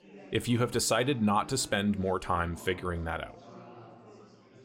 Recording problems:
chatter from many people; faint; throughout; 20 dB below the speech

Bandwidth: 16 kHz